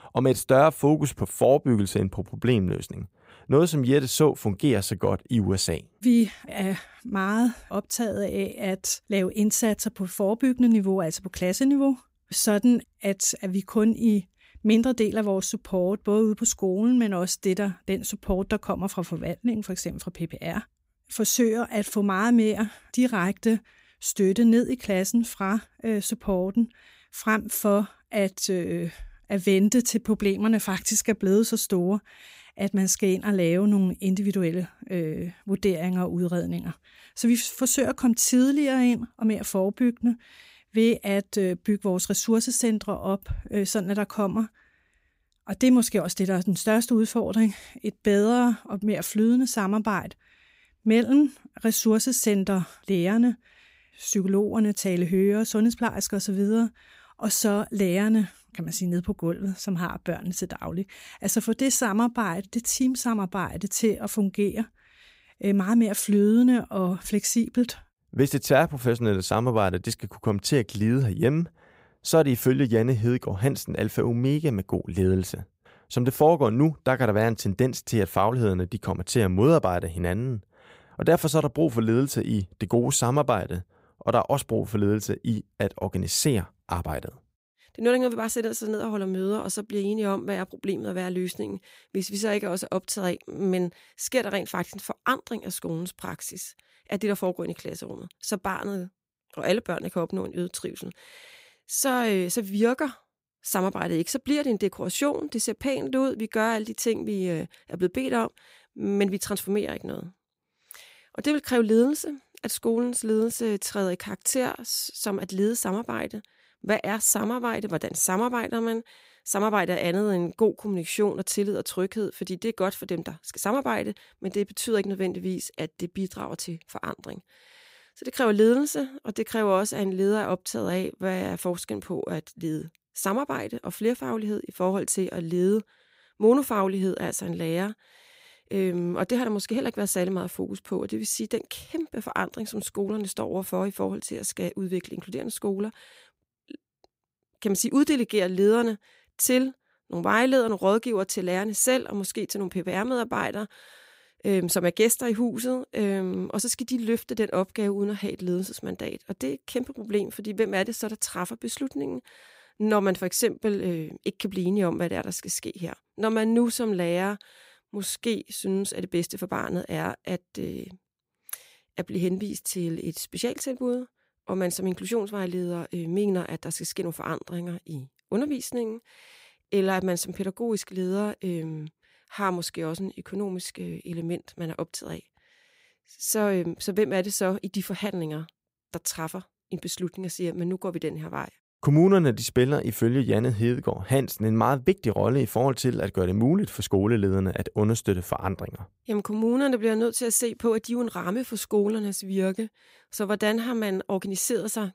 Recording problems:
none

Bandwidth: 15.5 kHz